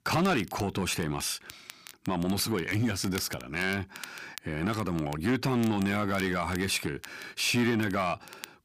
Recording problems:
distortion; slight; 10 dB below the speech
crackle, like an old record; noticeable; 20 dB below the speech

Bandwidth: 15 kHz